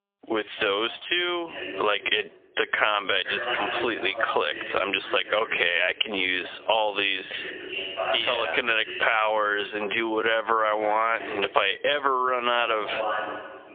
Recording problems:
phone-call audio; poor line; nothing above 3.5 kHz
thin; very; fading below 450 Hz
squashed, flat; heavily, background pumping
wrong speed, natural pitch; too slow; 0.6 times normal speed
voice in the background; loud; throughout; 9 dB below the speech

